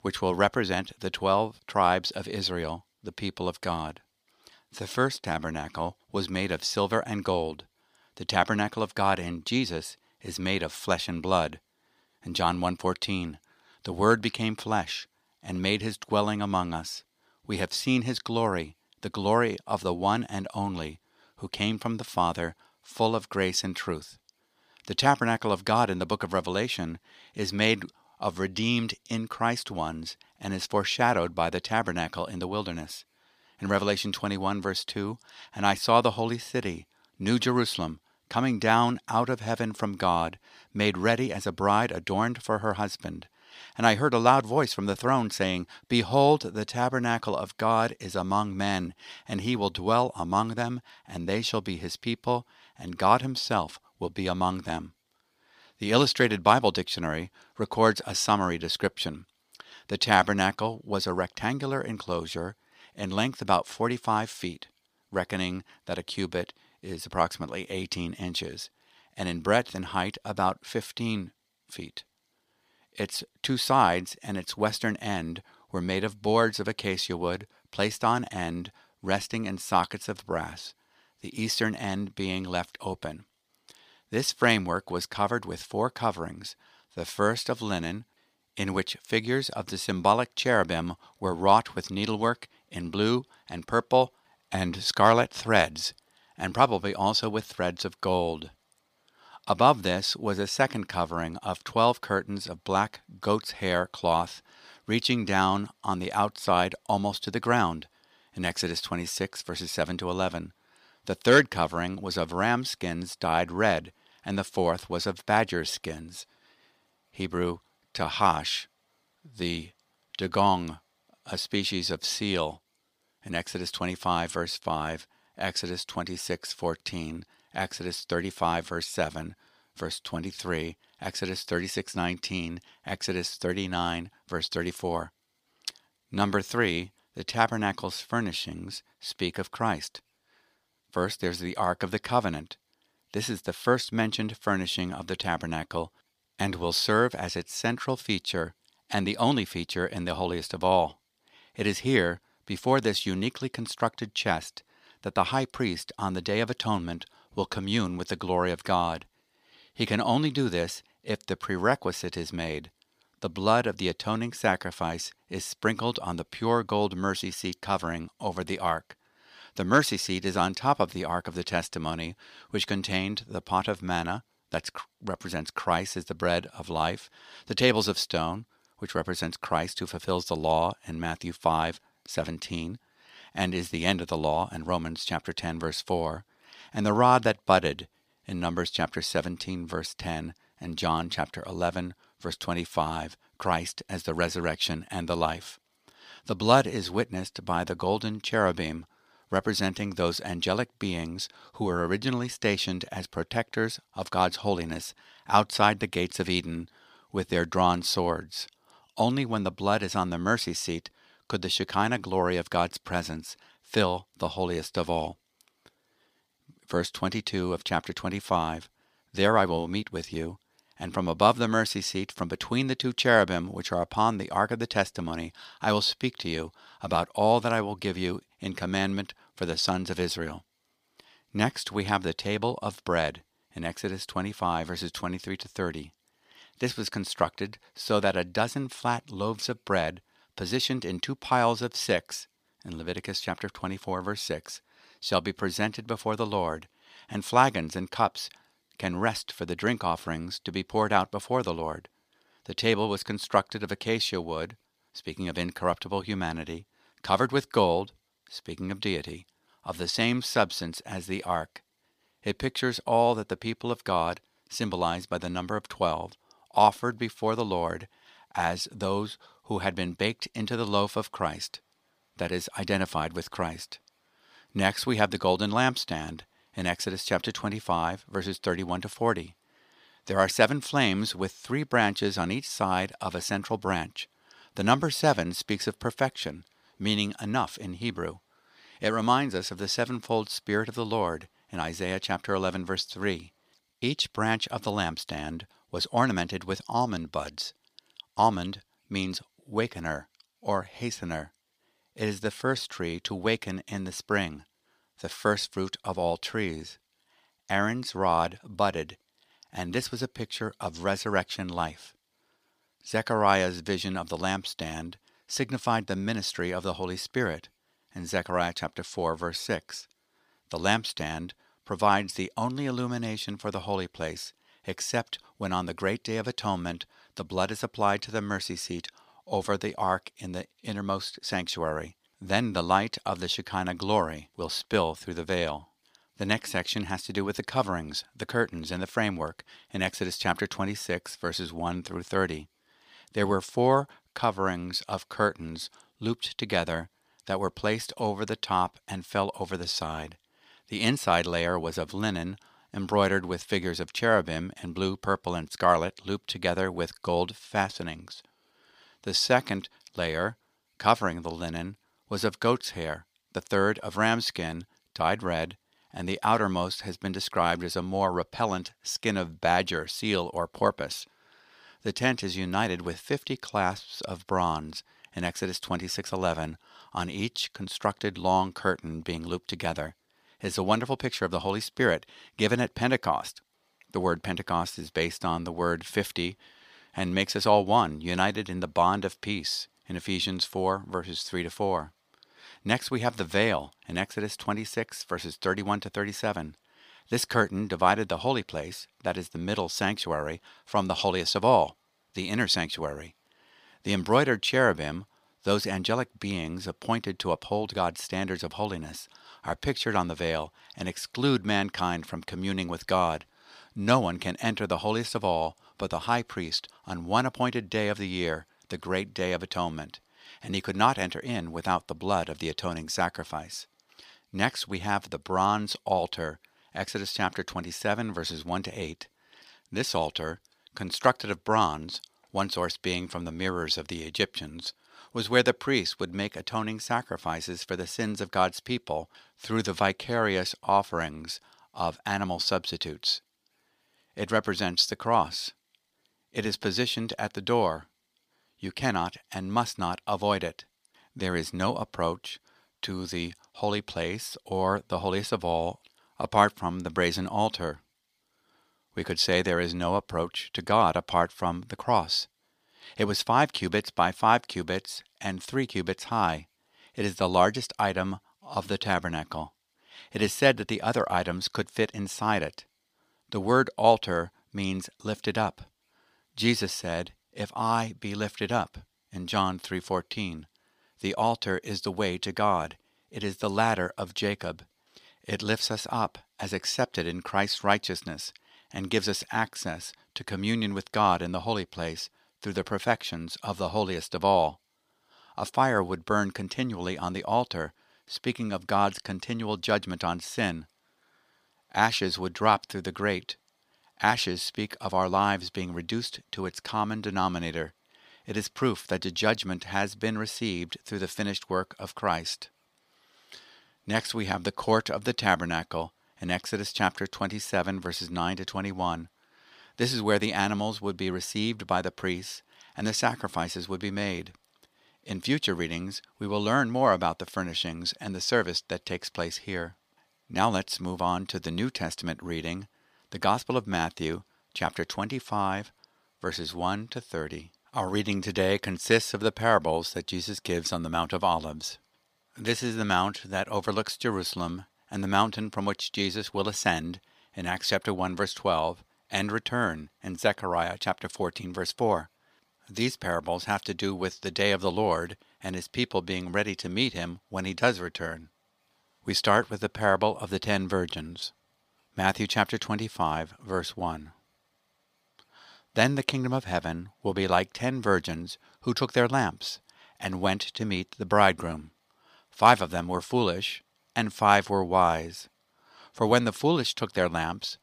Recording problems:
thin; somewhat; fading below 950 Hz

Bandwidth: 15 kHz